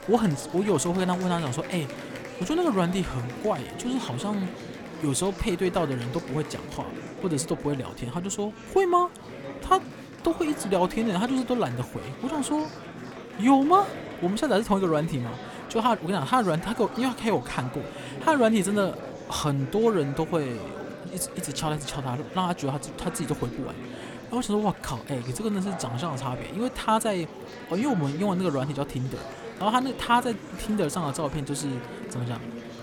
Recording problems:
murmuring crowd; noticeable; throughout; 10 dB below the speech

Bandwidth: 18.5 kHz